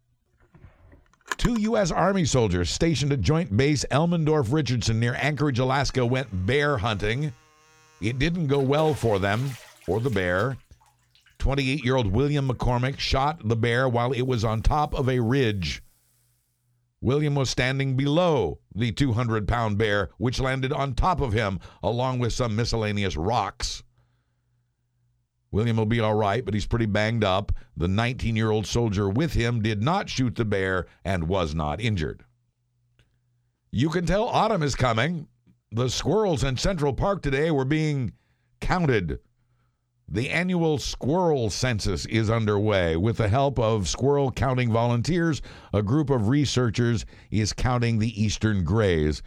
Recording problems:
household noises; noticeable; until 16 s; 20 dB below the speech

